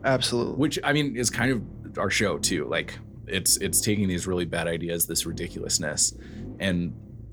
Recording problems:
low rumble; faint; throughout; 25 dB below the speech

